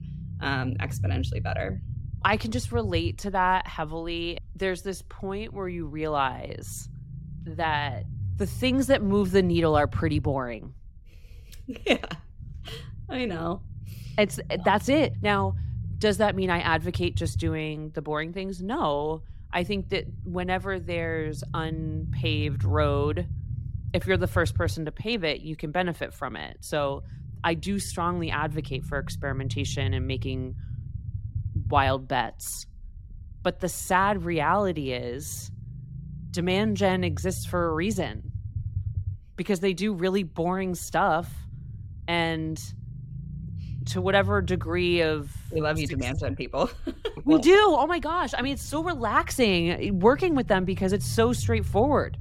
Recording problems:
low rumble; faint; throughout; 20 dB below the speech

